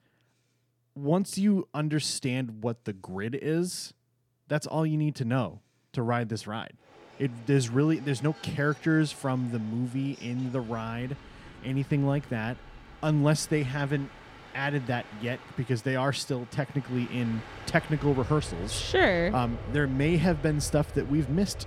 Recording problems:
train or aircraft noise; noticeable; from 7 s on; 15 dB below the speech

